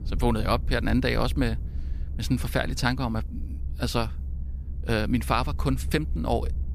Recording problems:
low rumble; faint; throughout; 20 dB below the speech

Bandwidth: 15 kHz